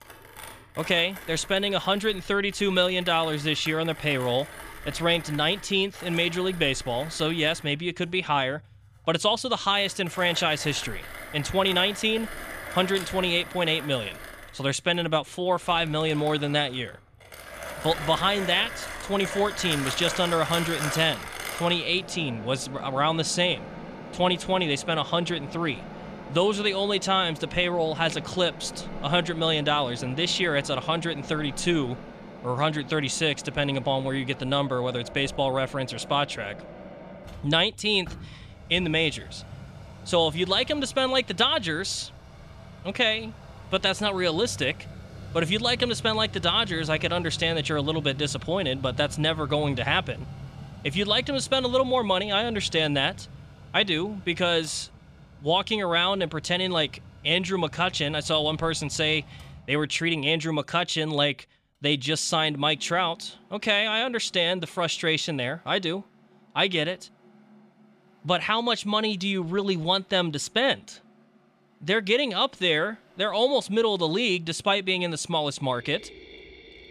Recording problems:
machinery noise; noticeable; throughout; 15 dB below the speech

